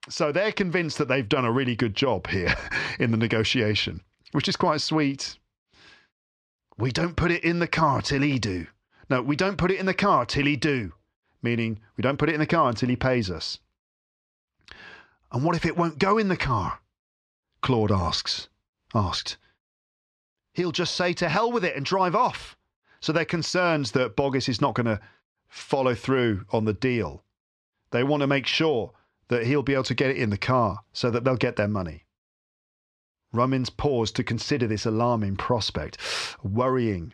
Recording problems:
muffled; very slightly; fading above 3.5 kHz

